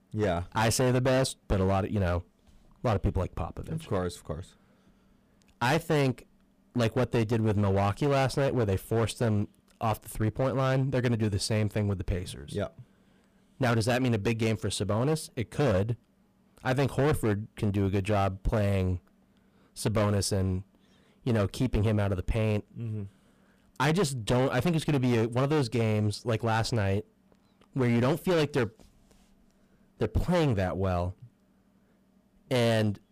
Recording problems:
distortion; heavy; 11% of the sound clipped

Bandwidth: 15 kHz